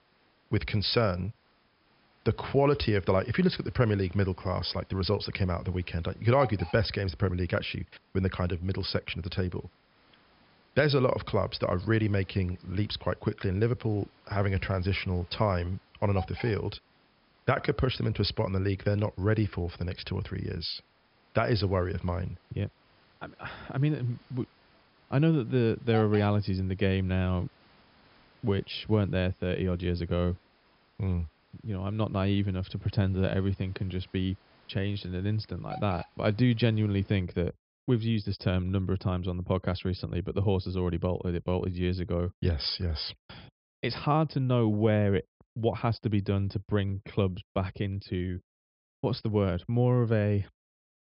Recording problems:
high frequencies cut off; noticeable; nothing above 5.5 kHz
hiss; faint; until 37 s; 25 dB below the speech

